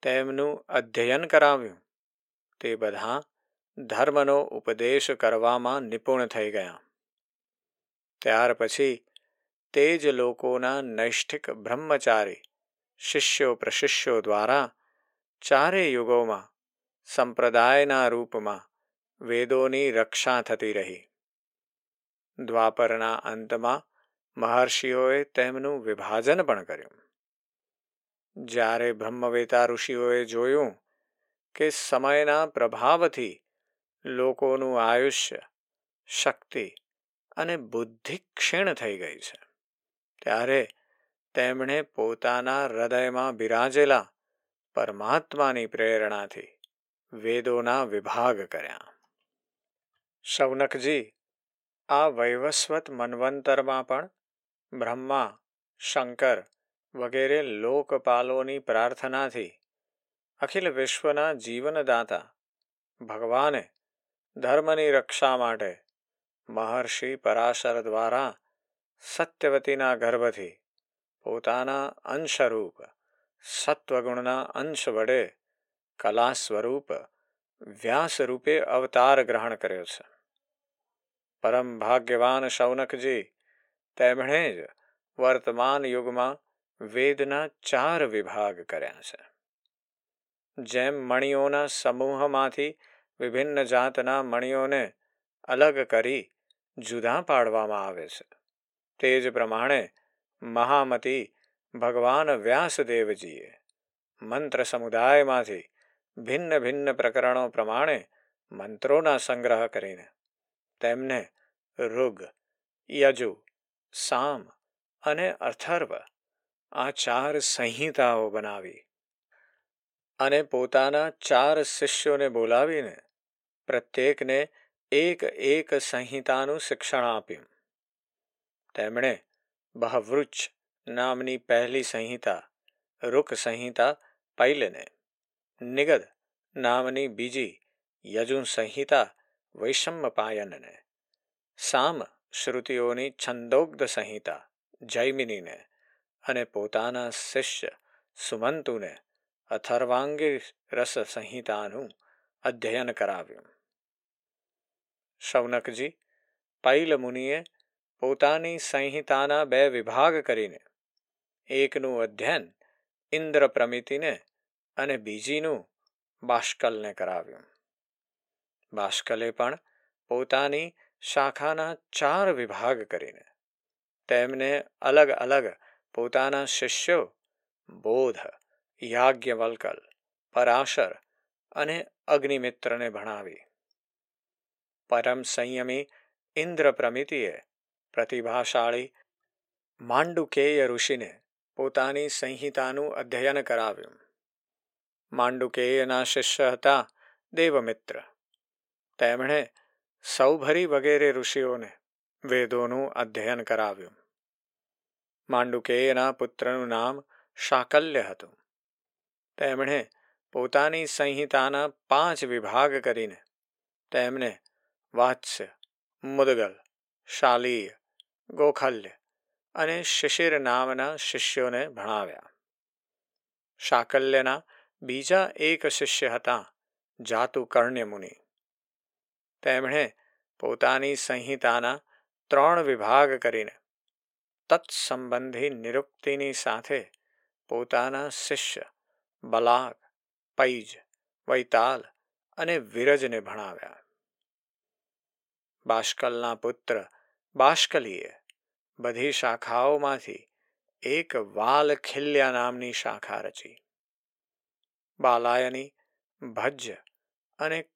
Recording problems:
thin; somewhat; fading below 500 Hz

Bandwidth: 16.5 kHz